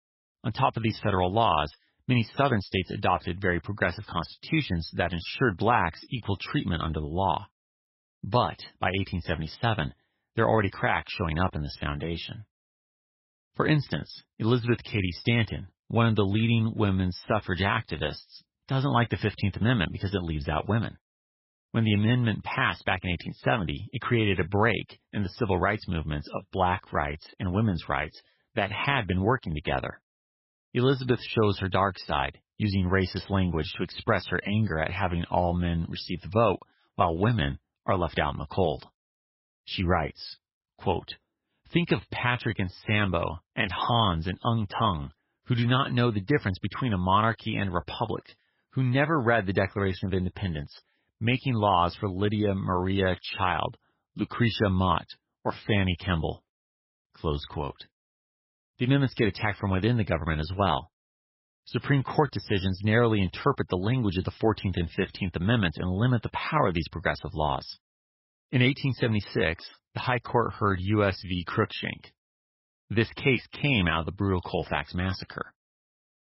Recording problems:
garbled, watery; badly; nothing above 5.5 kHz

